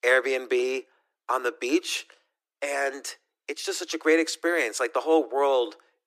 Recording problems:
thin; very; fading below 300 Hz

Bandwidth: 14.5 kHz